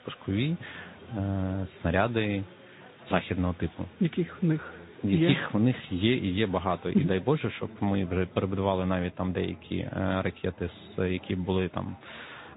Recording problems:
high frequencies cut off; severe; nothing above 4 kHz
garbled, watery; slightly
chatter from many people; faint; throughout; 20 dB below the speech

